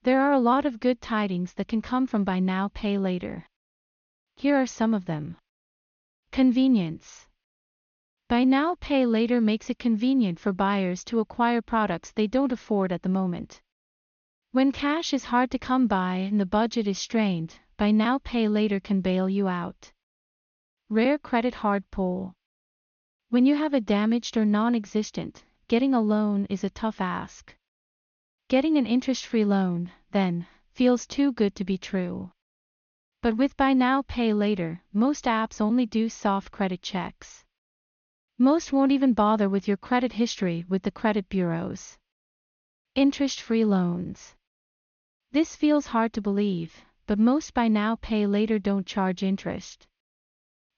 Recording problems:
high frequencies cut off; noticeable; nothing above 6.5 kHz

